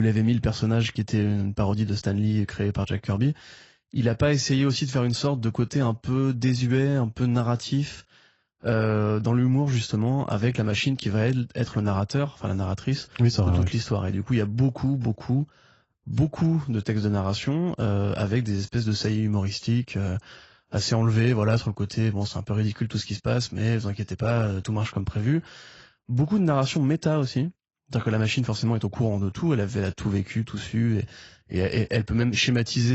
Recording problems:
garbled, watery; badly; nothing above 7.5 kHz
abrupt cut into speech; at the start and the end

